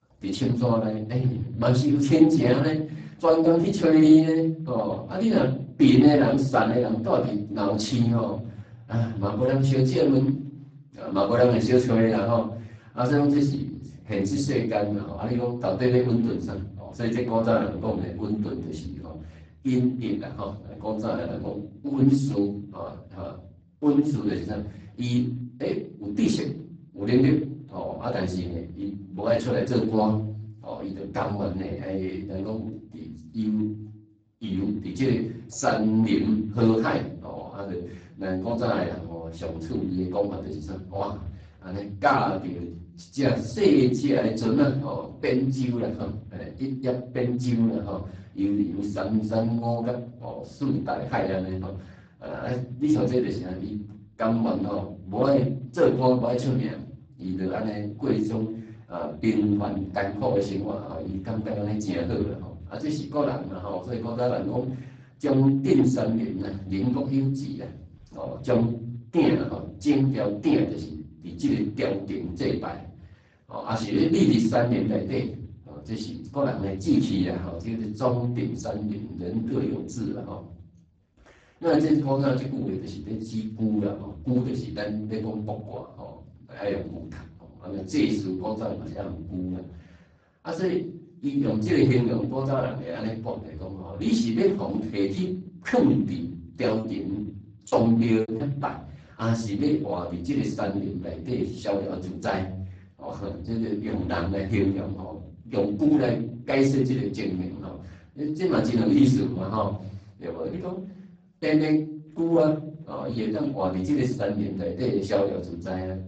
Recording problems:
off-mic speech; far
garbled, watery; badly; nothing above 7.5 kHz
room echo; slight; dies away in 0.6 s
choppy; very; from 1:37 to 1:38; 18% of the speech affected

